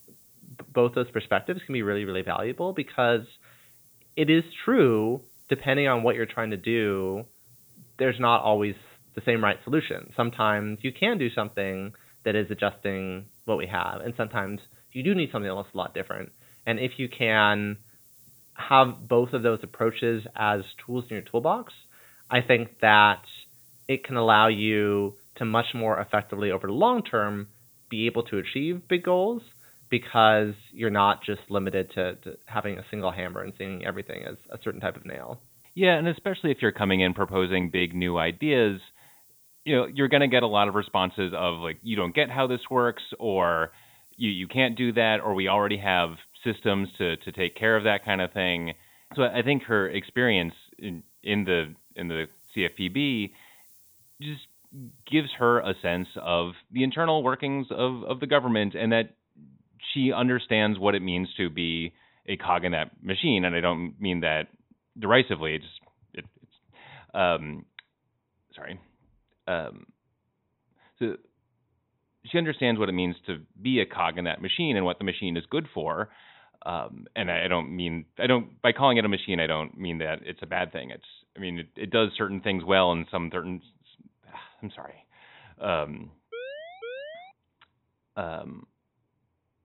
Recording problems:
high frequencies cut off; severe; nothing above 4 kHz
hiss; faint; until 56 s; 25 dB below the speech
siren; faint; at 1:26; peak 10 dB below the speech

